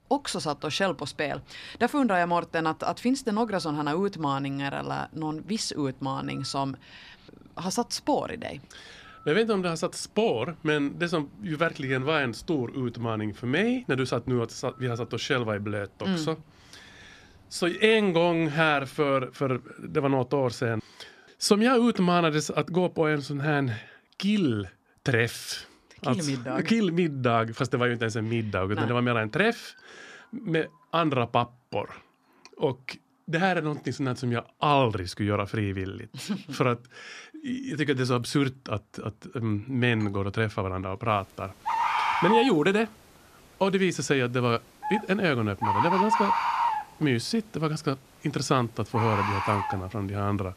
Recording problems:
animal sounds; loud; throughout; 1 dB below the speech

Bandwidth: 14.5 kHz